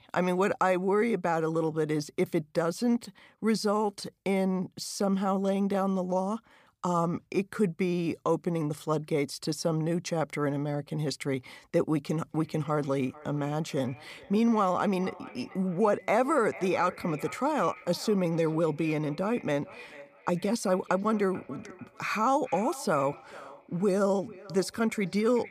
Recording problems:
echo of what is said; faint; from 12 s on; 440 ms later, 20 dB below the speech

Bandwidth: 15 kHz